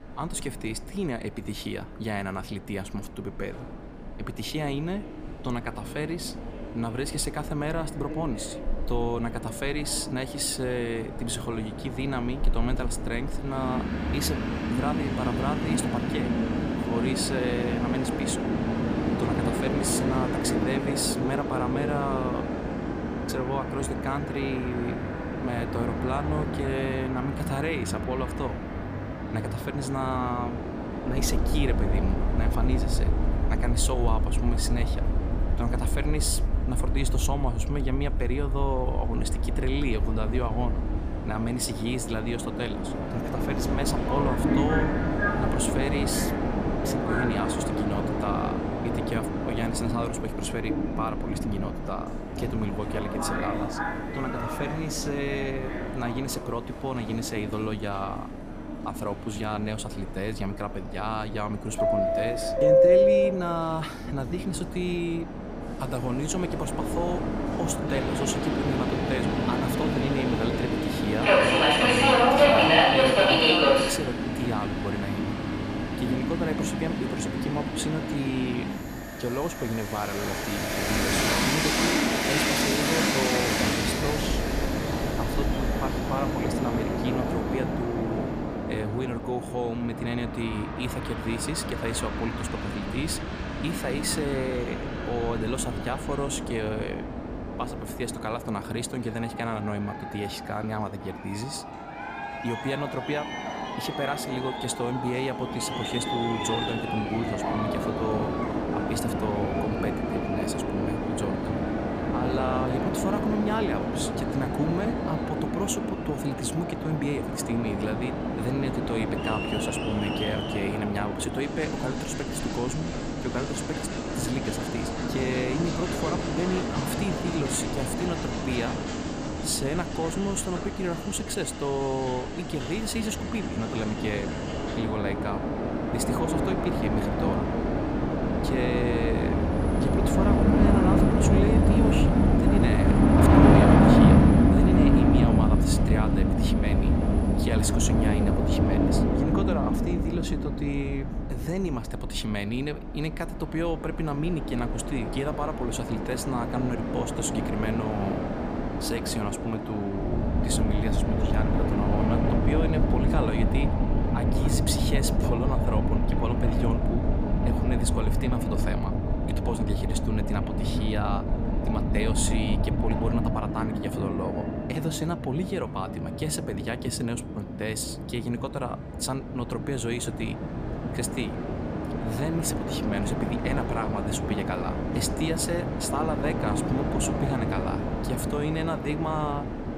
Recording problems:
train or aircraft noise; very loud; throughout; 4 dB above the speech

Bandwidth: 15 kHz